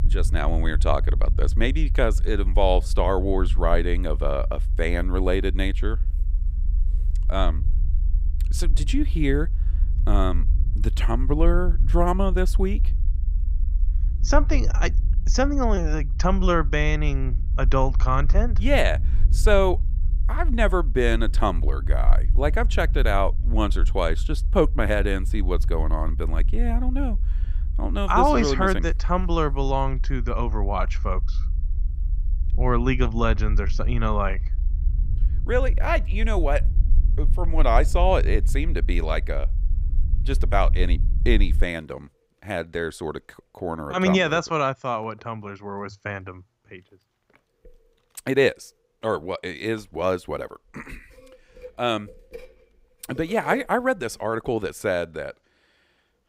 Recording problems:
low rumble; faint; until 42 s; 20 dB below the speech

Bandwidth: 15.5 kHz